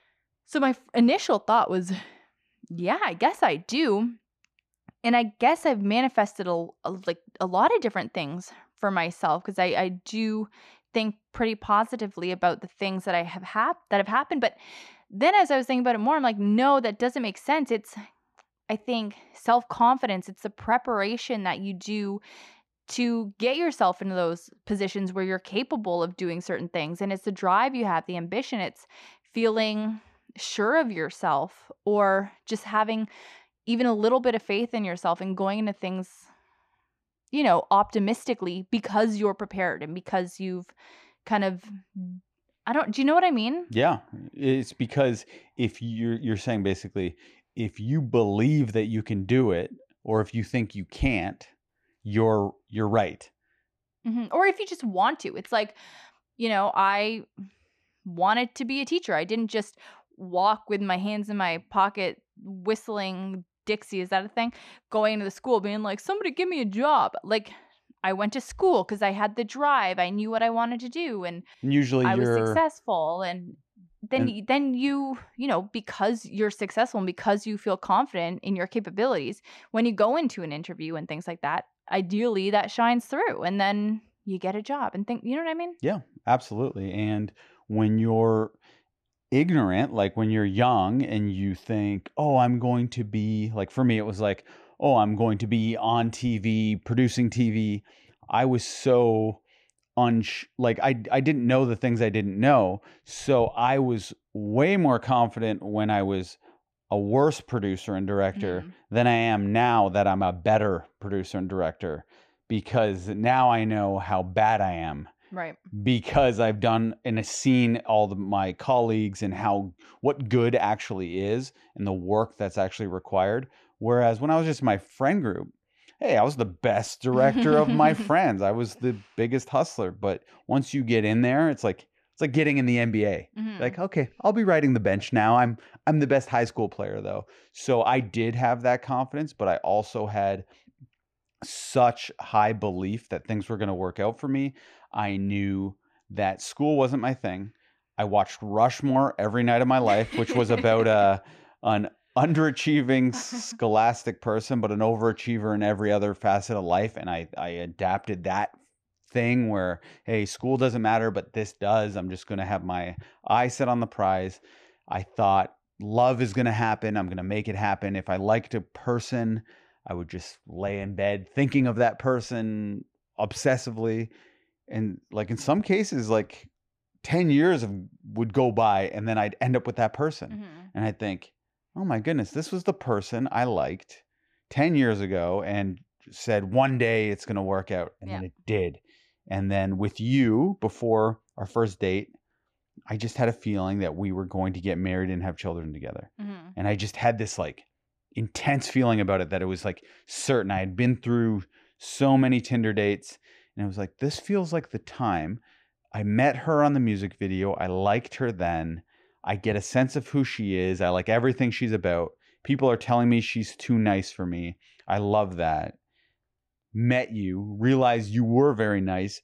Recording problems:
muffled; slightly; fading above 3.5 kHz

